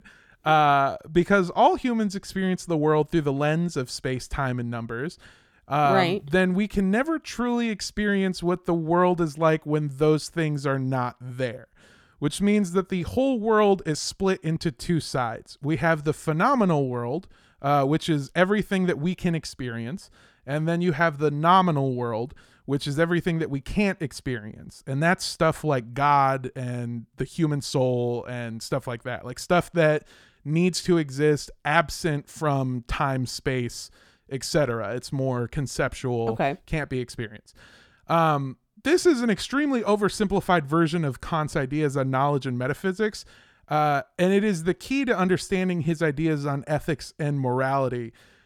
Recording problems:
none

